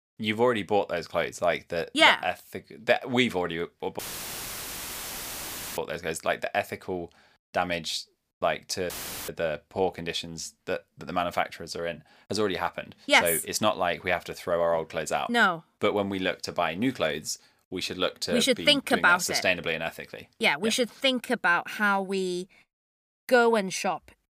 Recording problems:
audio cutting out; filled with static; at 4 s for 2 s and at 9 s

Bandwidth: 15 kHz